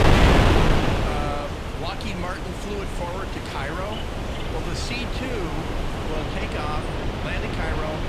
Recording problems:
wind noise on the microphone; heavy; 4 dB above the speech
animal sounds; noticeable; throughout; 15 dB below the speech
rain or running water; noticeable; throughout; 15 dB below the speech

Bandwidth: 15.5 kHz